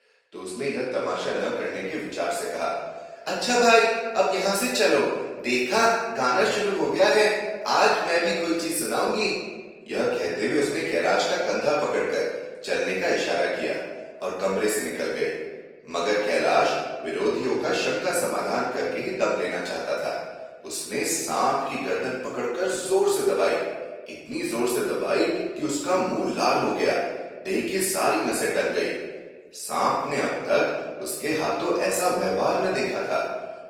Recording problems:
off-mic speech; far
room echo; noticeable; dies away in 1.1 s
thin; somewhat; fading below 400 Hz
garbled, watery; slightly; nothing above 18.5 kHz

